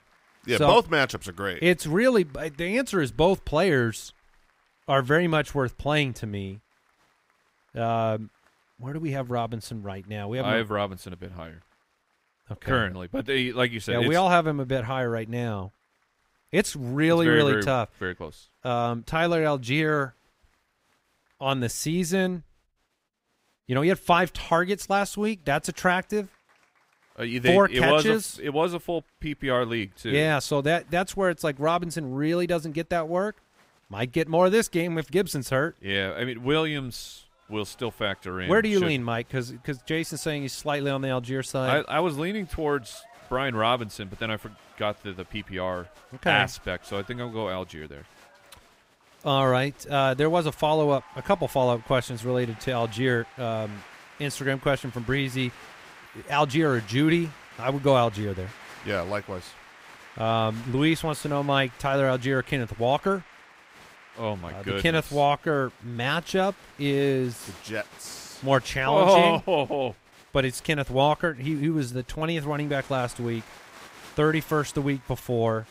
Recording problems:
crowd noise; faint; throughout; 25 dB below the speech

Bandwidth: 15.5 kHz